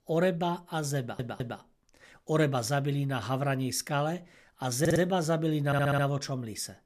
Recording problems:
audio stuttering; at 1 s, at 5 s and at 5.5 s

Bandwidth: 14 kHz